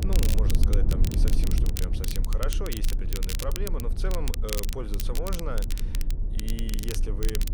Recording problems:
low rumble; loud; throughout; 6 dB below the speech
crackle, like an old record; loud; as loud as the speech

